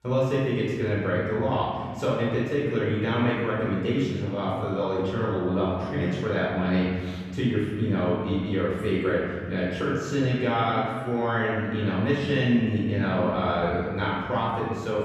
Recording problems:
room echo; strong; dies away in 2 s
off-mic speech; far

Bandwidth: 15 kHz